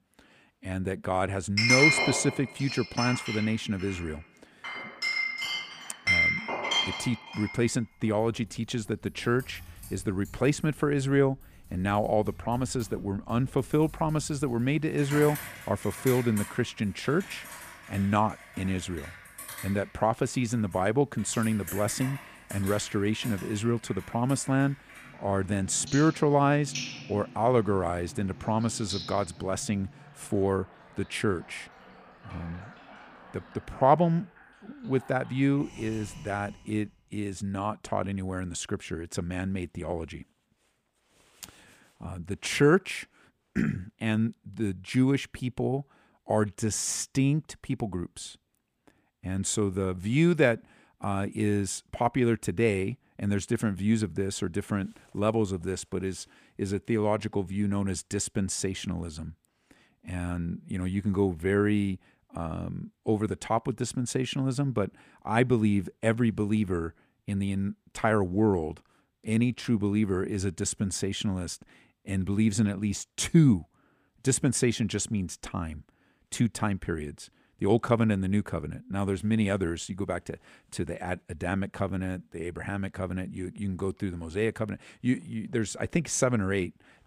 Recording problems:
household noises; loud; until 36 s; 2 dB below the speech

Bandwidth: 15 kHz